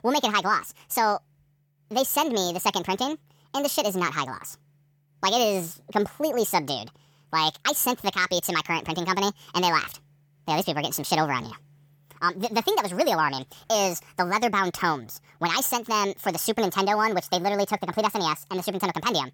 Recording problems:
wrong speed and pitch; too fast and too high; 1.6 times normal speed

